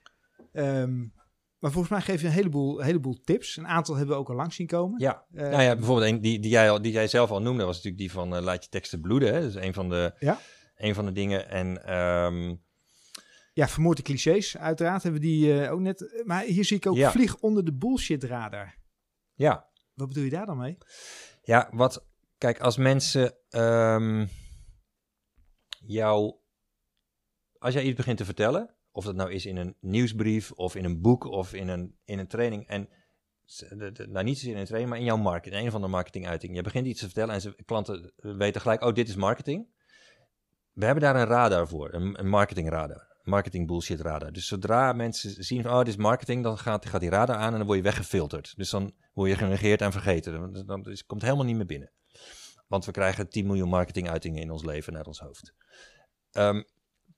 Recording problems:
none

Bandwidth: 15 kHz